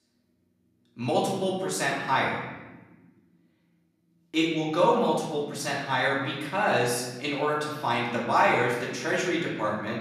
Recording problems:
off-mic speech; far
room echo; noticeable; dies away in 1.2 s

